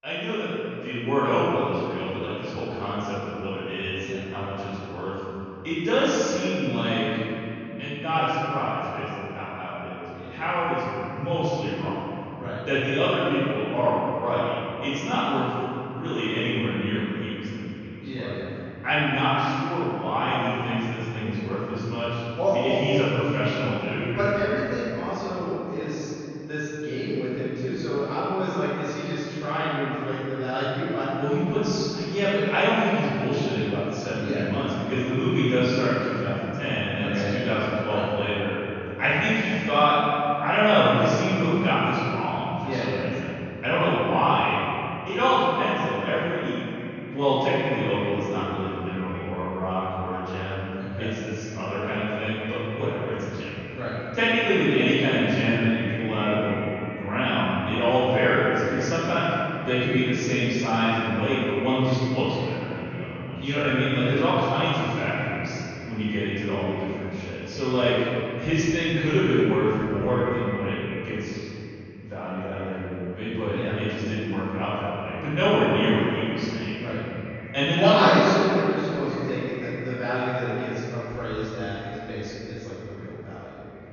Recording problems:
room echo; strong; dies away in 3 s
off-mic speech; far
high frequencies cut off; noticeable; nothing above 6.5 kHz
echo of what is said; faint; from 47 s on; 480 ms later, 20 dB below the speech

